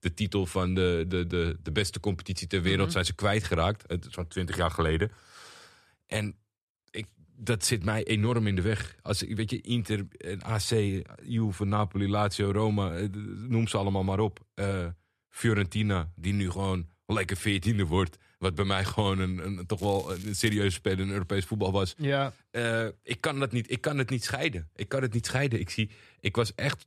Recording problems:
crackling; noticeable; at 20 s; 20 dB below the speech

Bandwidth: 13.5 kHz